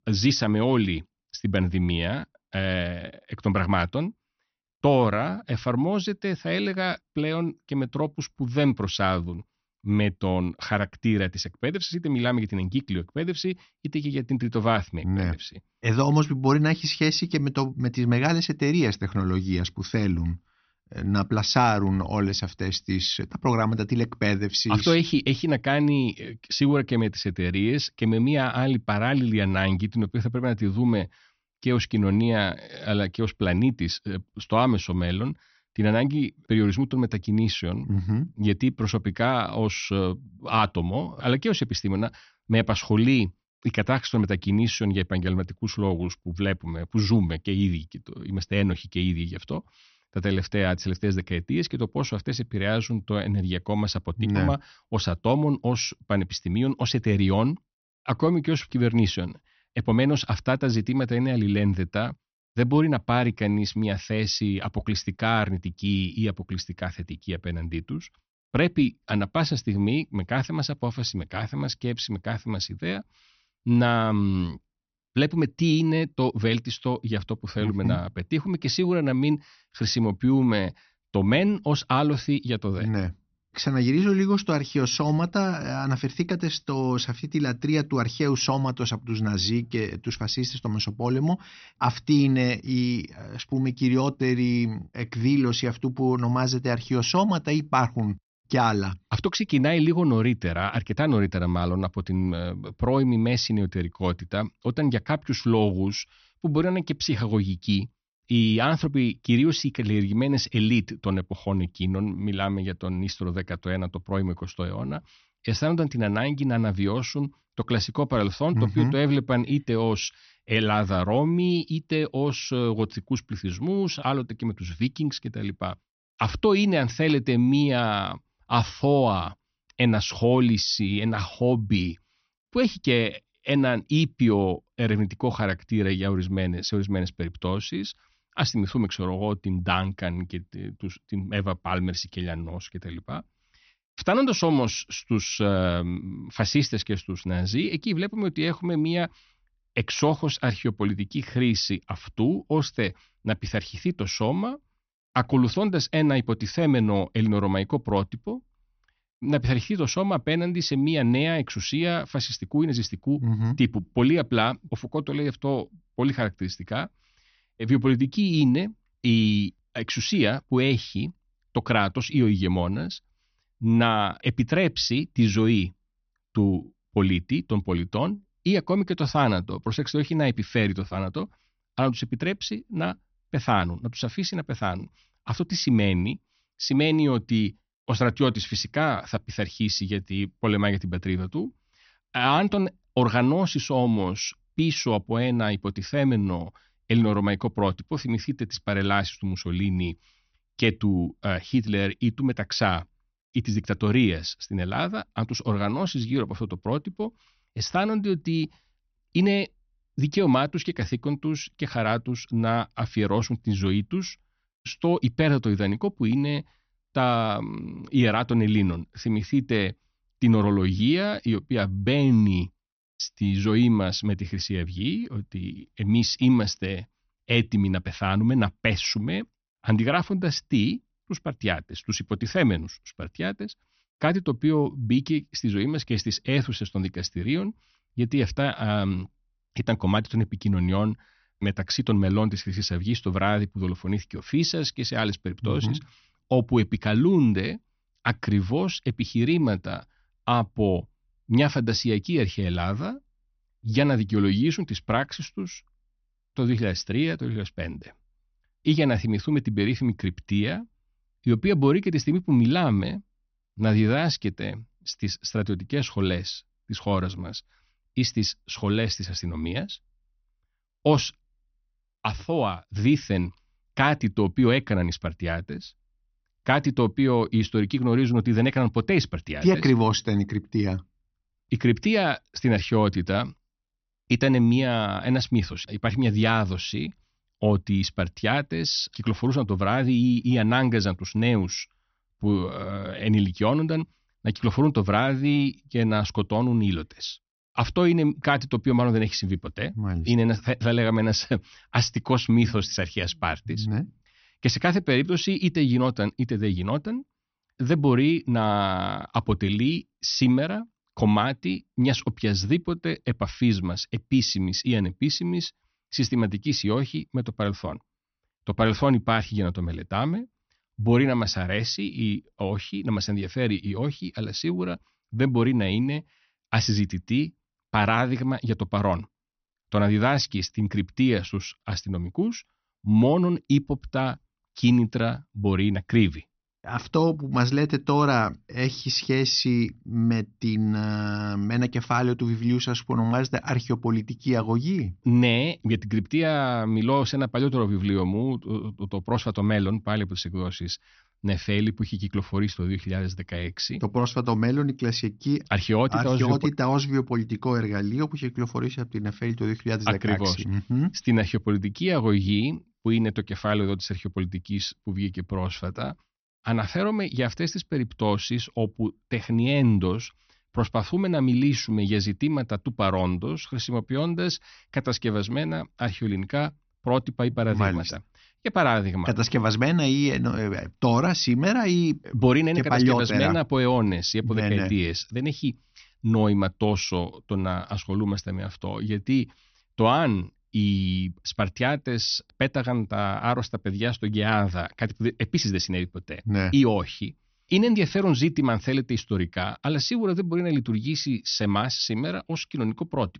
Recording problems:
high frequencies cut off; noticeable; nothing above 6 kHz

